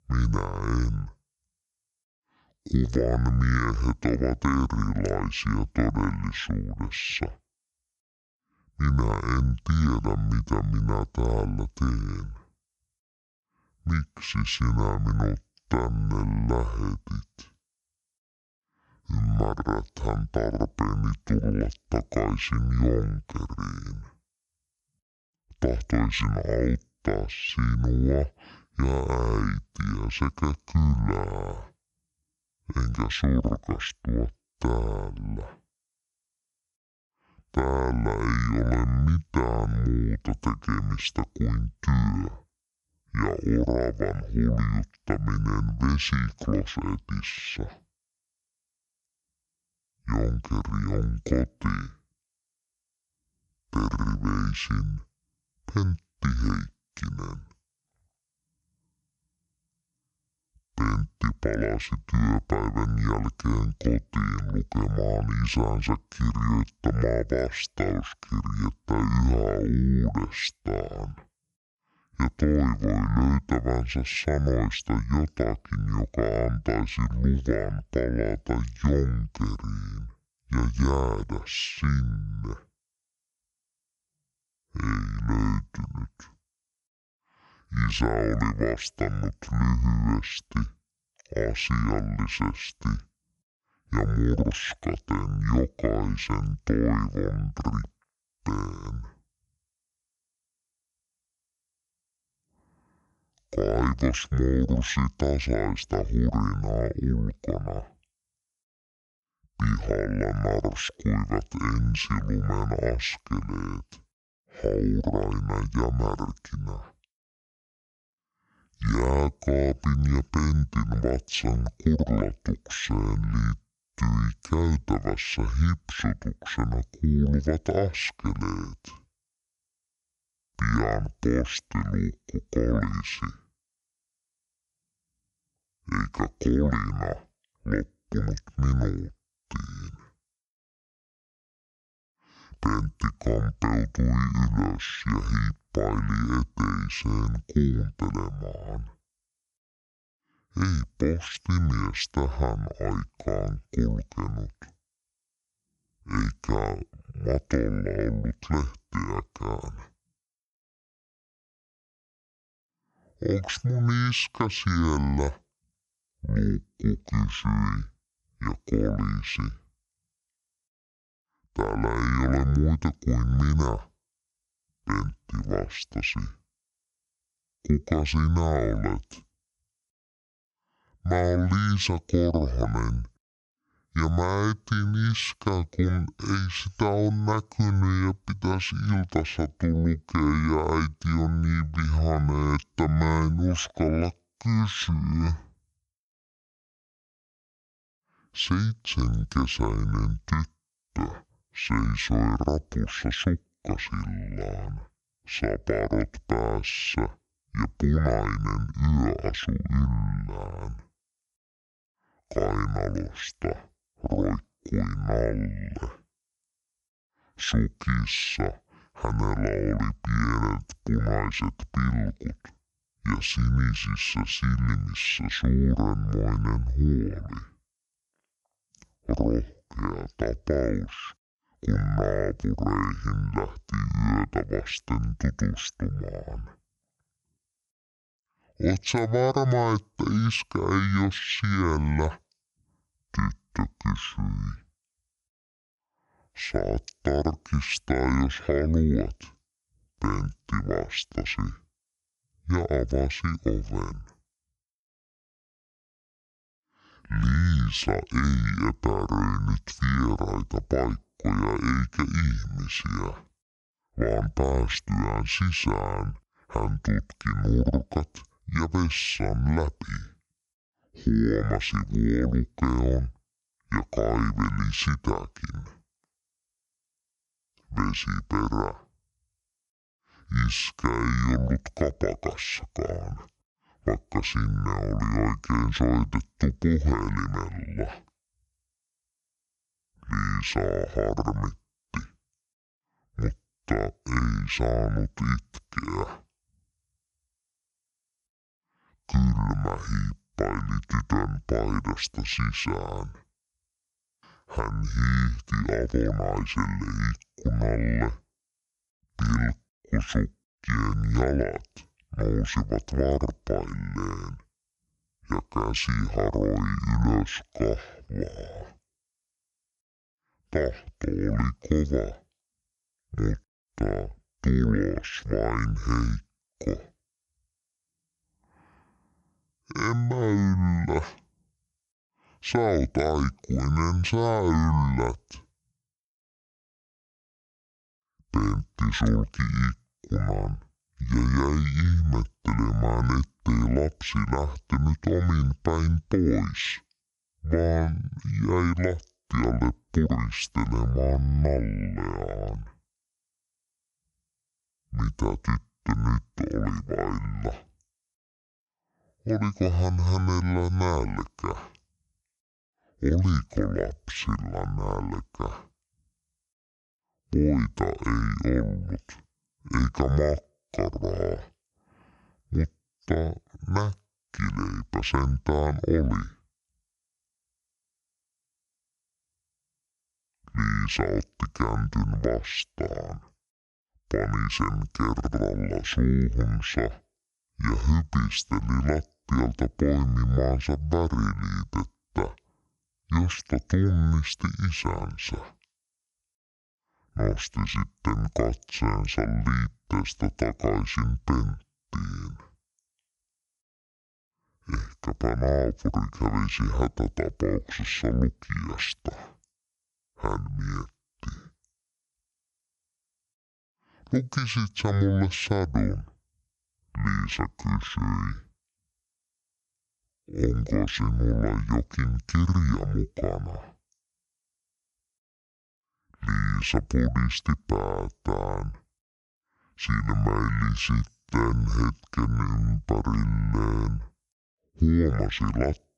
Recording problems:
wrong speed and pitch; too slow and too low; 0.6 times normal speed

